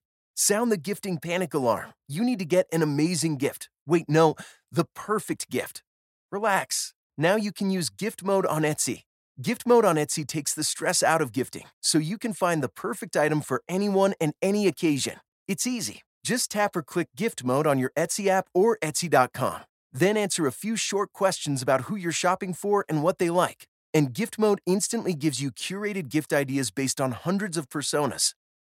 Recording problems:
none

